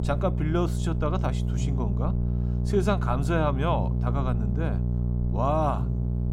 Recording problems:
electrical hum; loud; throughout; 60 Hz, 10 dB below the speech

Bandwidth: 16.5 kHz